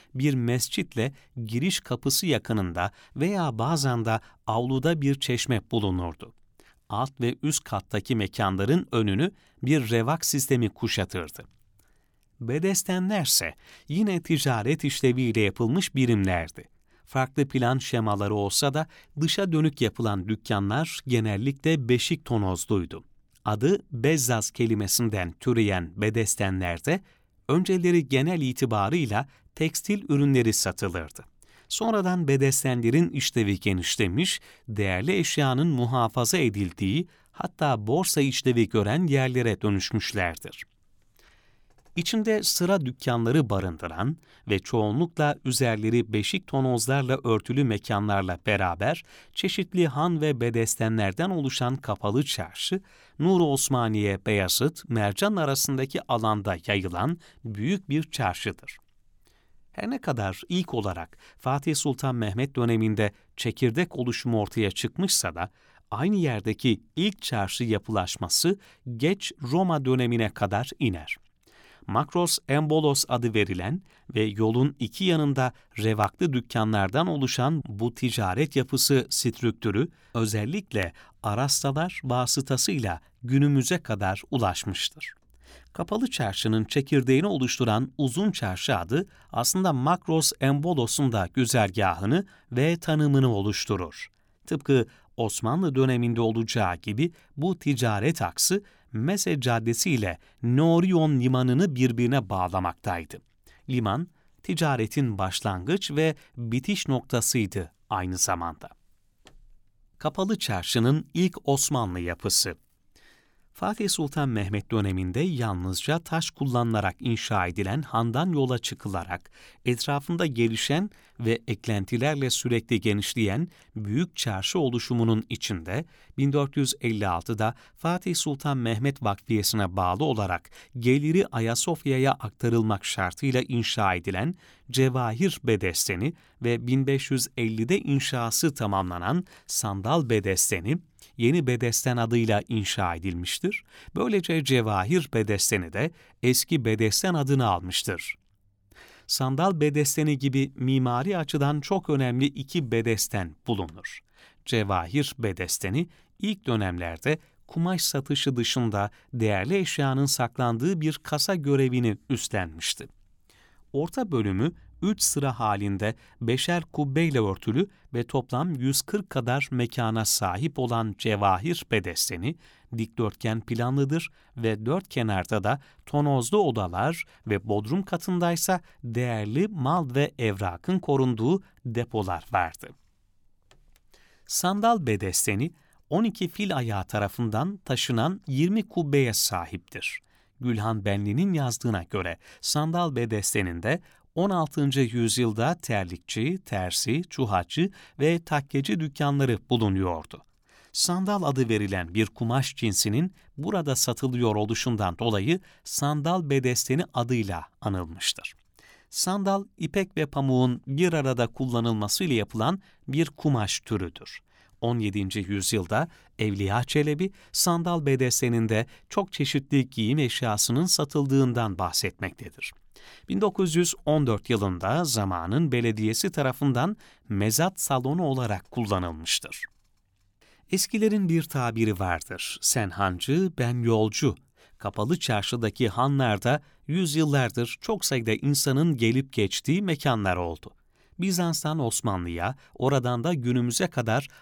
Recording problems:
none

